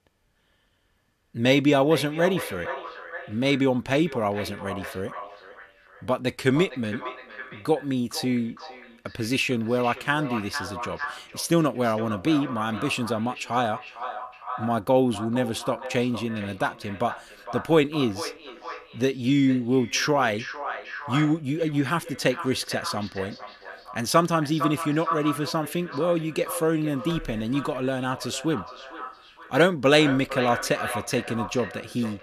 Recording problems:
echo of what is said; strong; throughout; 460 ms later, 10 dB below the speech

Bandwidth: 14.5 kHz